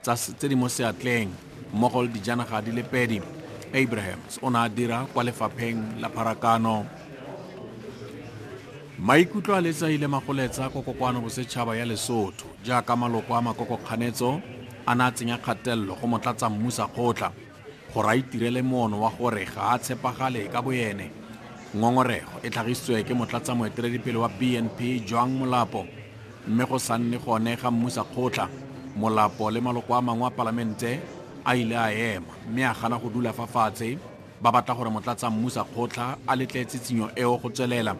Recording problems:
chatter from many people; noticeable; throughout; 15 dB below the speech

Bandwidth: 14 kHz